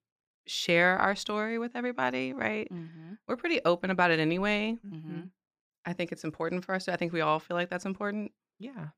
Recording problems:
none

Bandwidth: 15 kHz